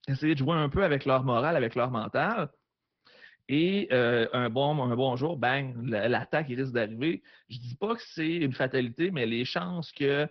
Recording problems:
high frequencies cut off; noticeable; nothing above 5.5 kHz
garbled, watery; slightly

